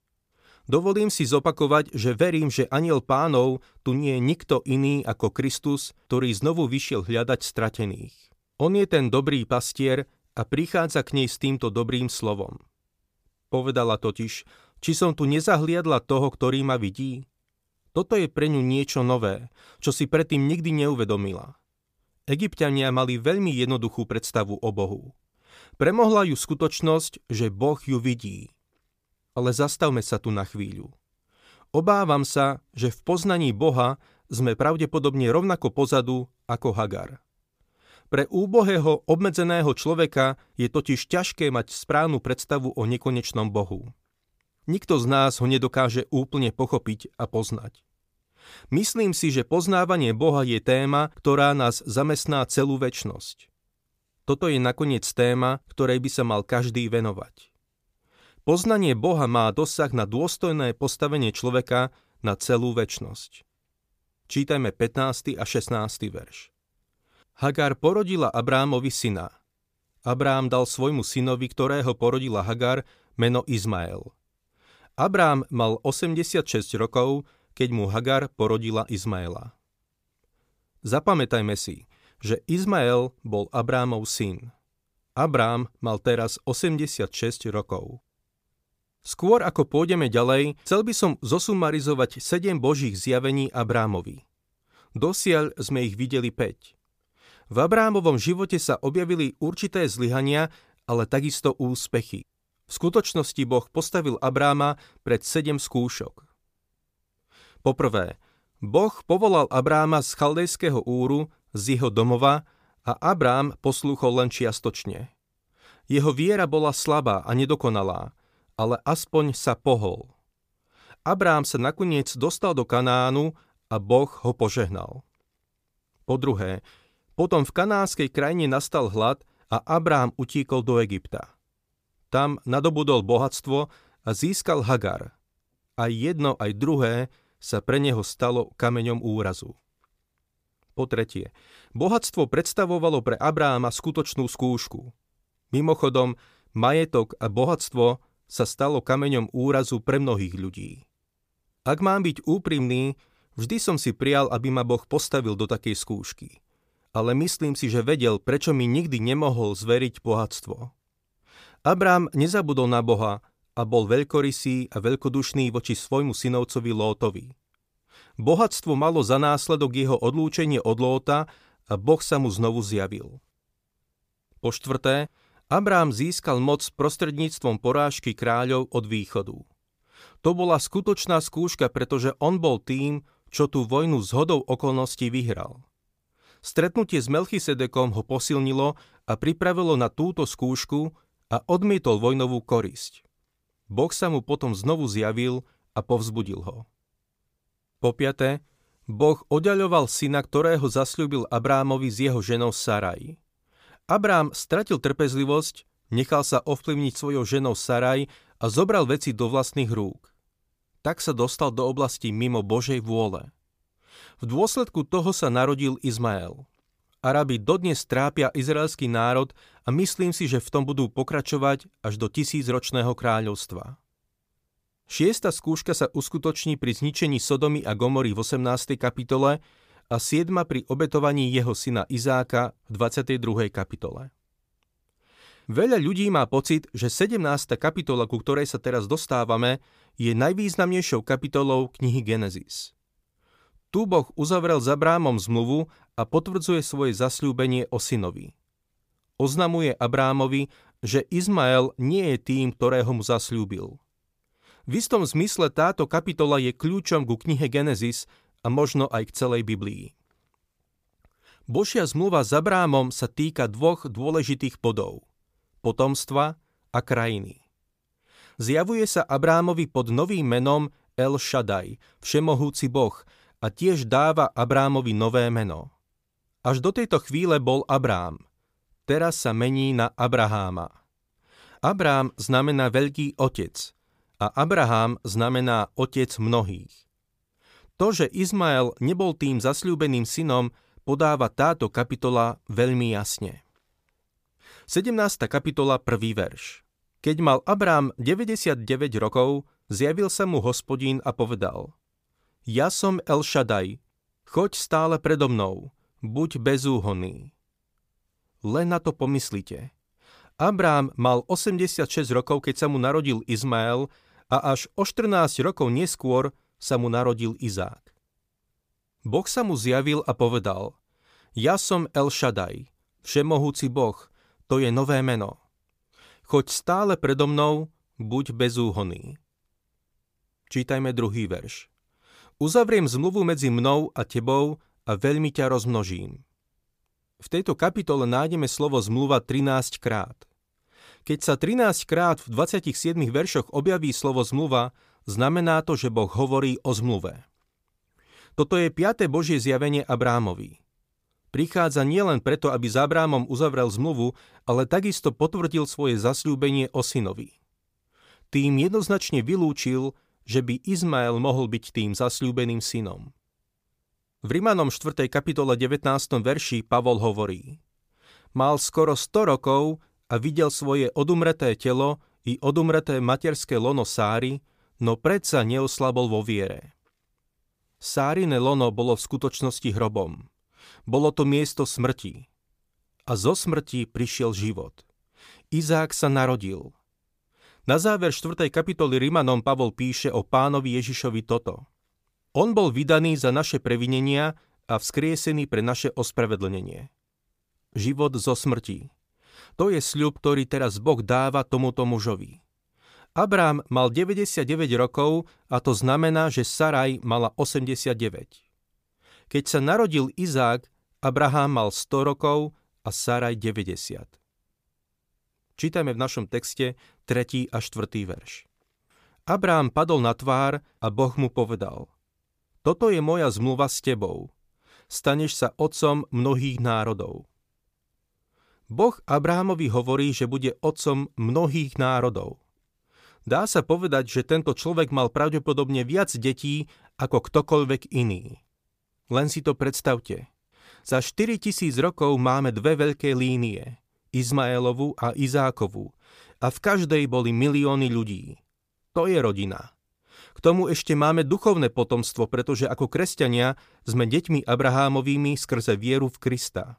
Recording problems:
none

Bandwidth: 15 kHz